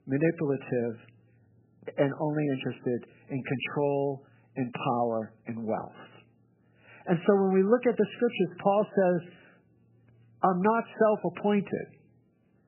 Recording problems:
garbled, watery; badly; nothing above 3 kHz

